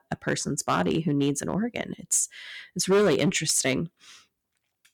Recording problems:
distortion; heavy; 4% of the sound clipped

